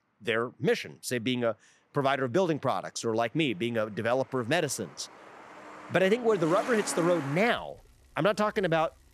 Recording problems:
traffic noise; noticeable; throughout; 15 dB below the speech

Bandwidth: 14.5 kHz